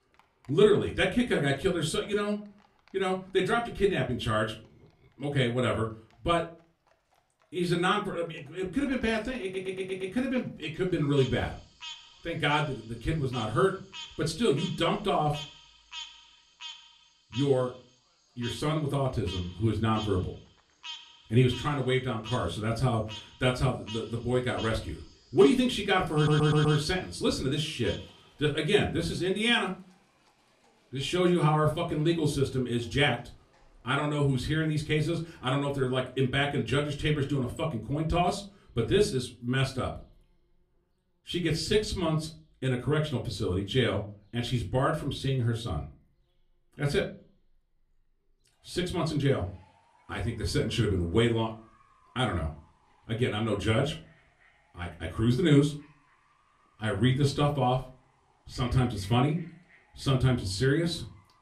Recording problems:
off-mic speech; far
room echo; very slight; dies away in 0.3 s
animal sounds; noticeable; throughout; 15 dB below the speech
audio stuttering; at 9.5 s and at 26 s

